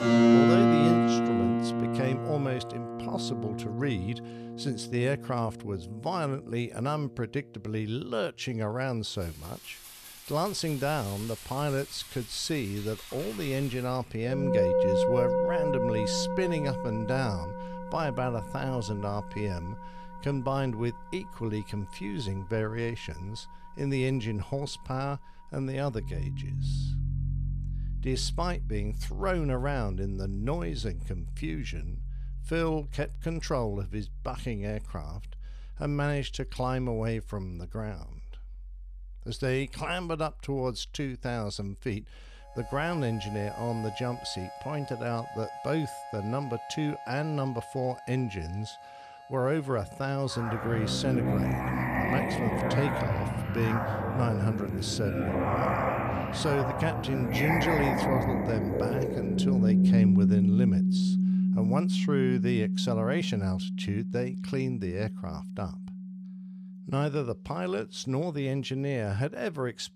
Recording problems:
background music; very loud; throughout; 3 dB above the speech

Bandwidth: 14 kHz